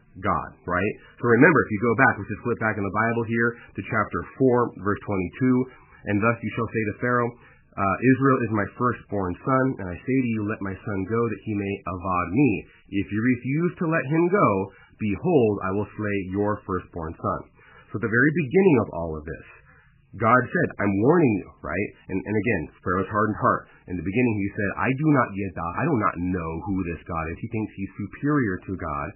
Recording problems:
garbled, watery; badly; nothing above 2.5 kHz

